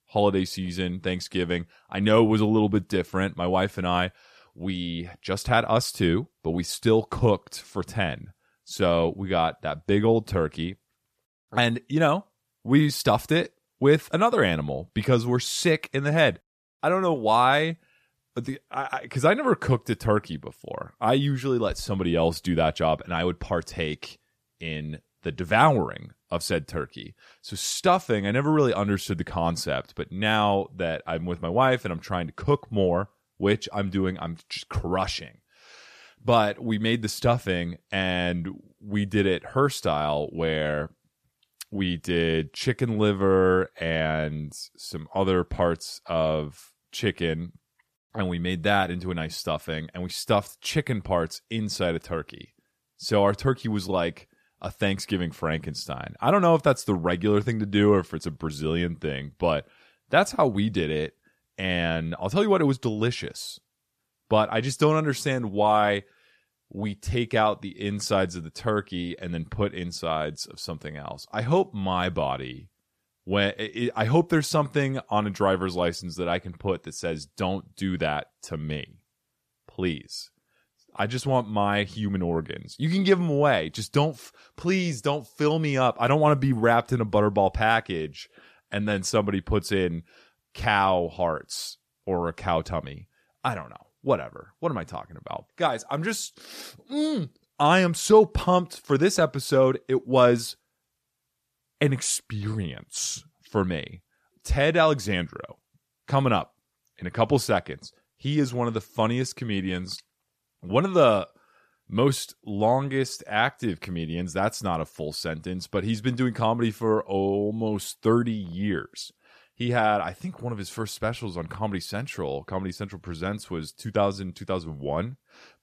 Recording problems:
none

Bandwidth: 14.5 kHz